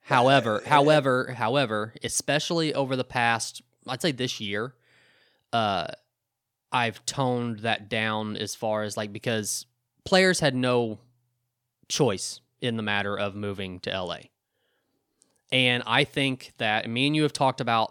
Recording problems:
none

